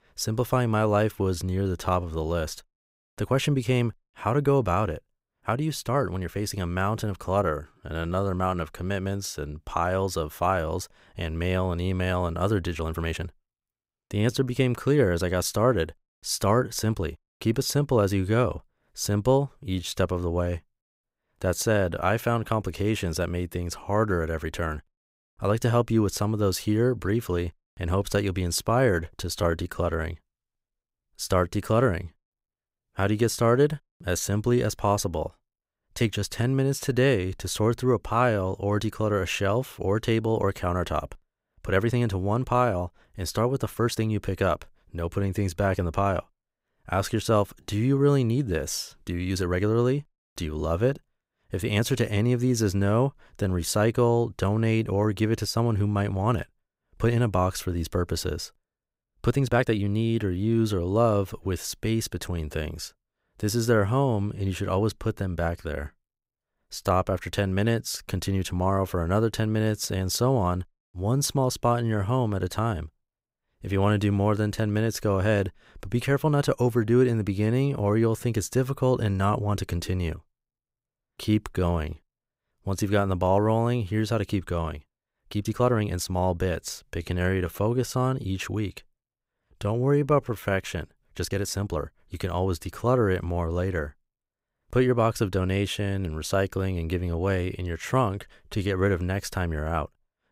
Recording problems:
uneven, jittery; strongly; from 1 s to 1:39

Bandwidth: 15.5 kHz